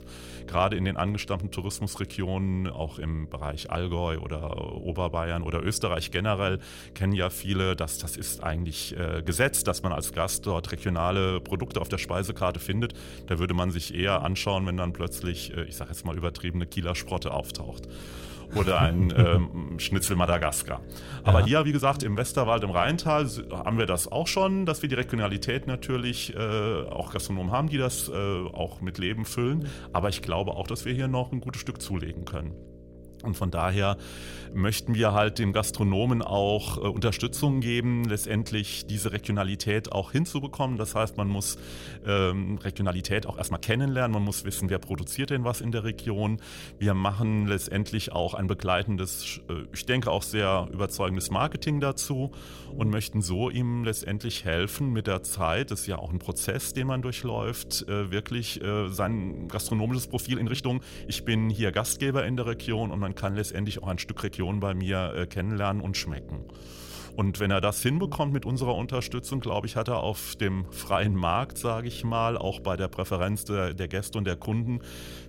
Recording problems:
electrical hum; faint; throughout; 60 Hz, 20 dB below the speech
uneven, jittery; strongly; from 12 s to 1:12

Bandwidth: 16 kHz